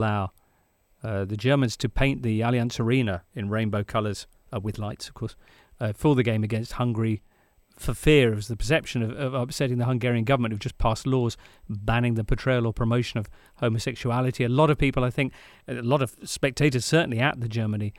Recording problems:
abrupt cut into speech; at the start

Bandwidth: 16.5 kHz